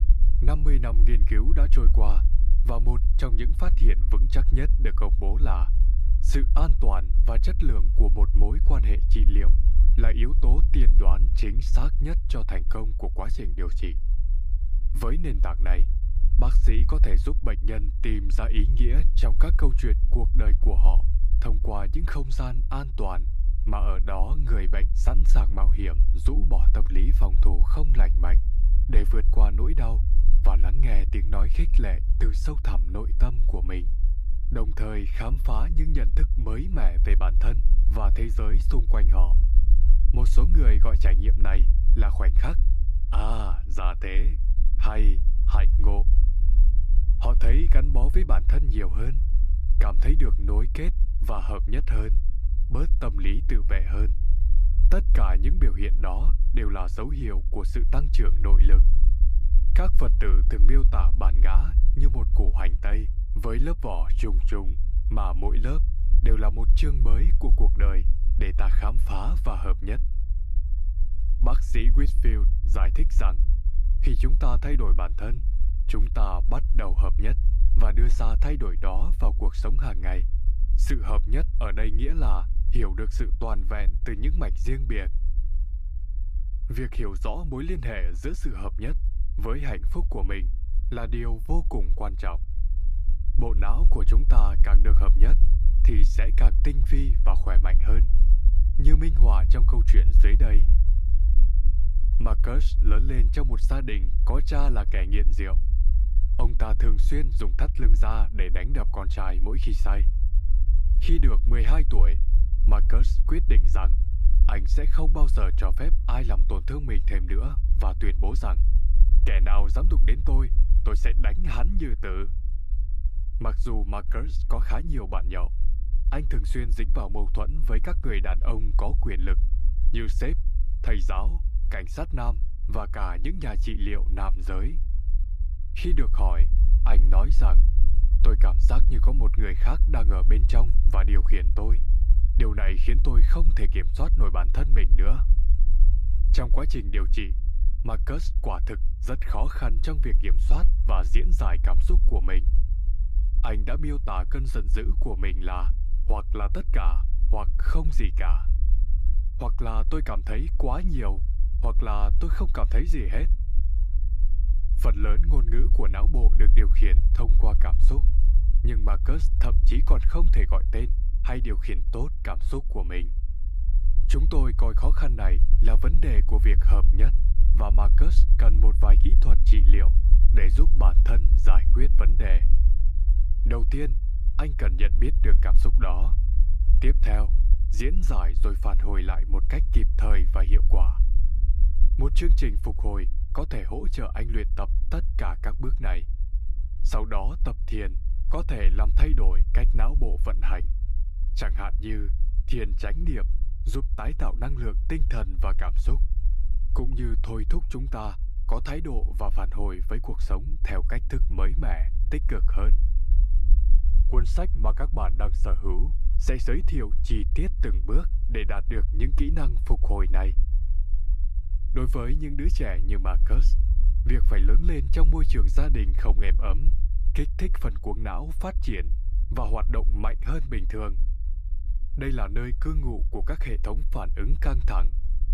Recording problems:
low rumble; noticeable; throughout; 10 dB below the speech

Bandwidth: 15 kHz